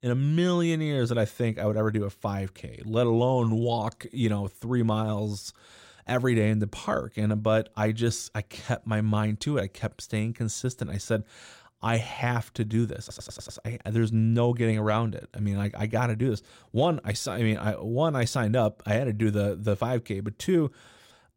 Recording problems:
audio stuttering; at 13 s

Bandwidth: 16 kHz